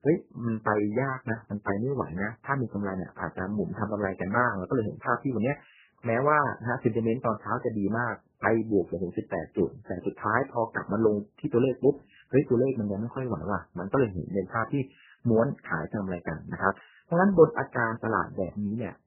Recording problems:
garbled, watery; badly; nothing above 3 kHz

